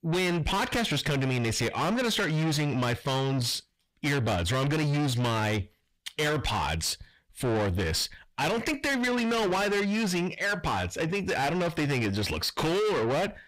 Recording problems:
distortion; heavy; 6 dB below the speech

